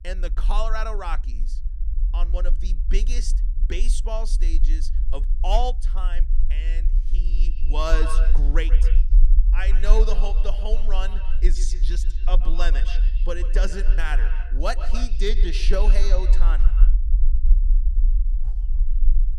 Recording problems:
echo of what is said; strong; from 7.5 s on; 130 ms later, 10 dB below the speech
low rumble; noticeable; throughout; 15 dB below the speech

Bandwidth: 15 kHz